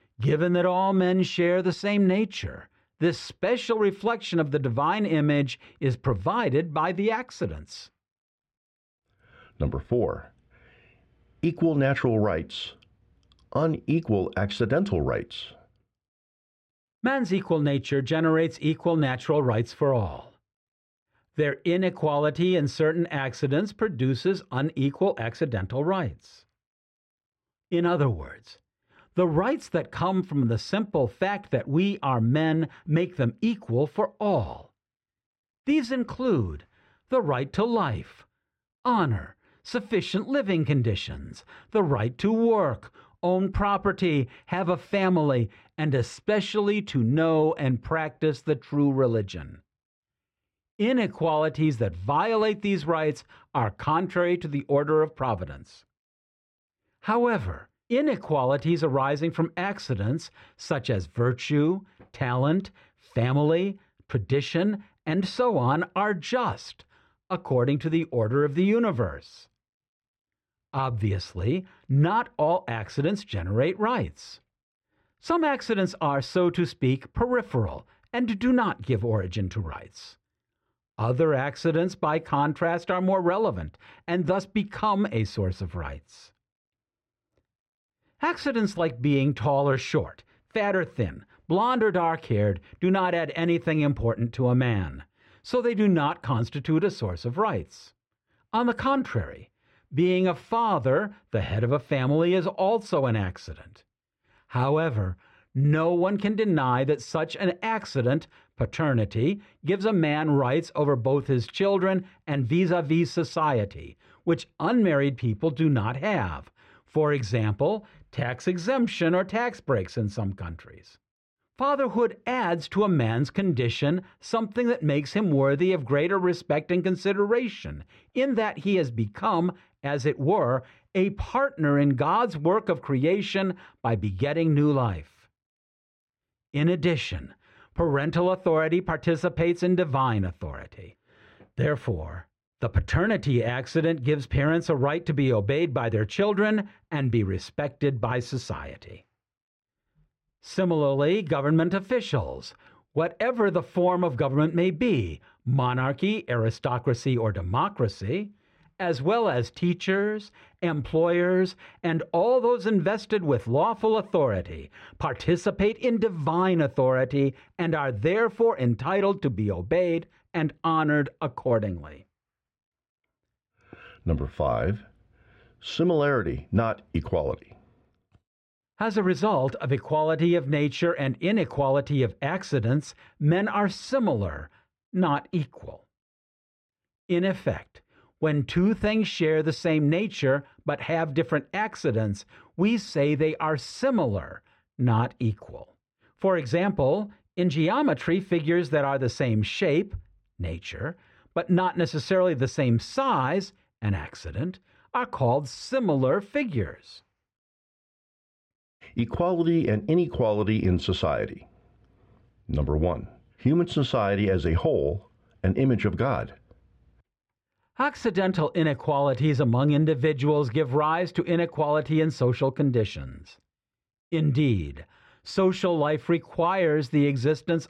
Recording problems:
muffled; slightly; fading above 2.5 kHz

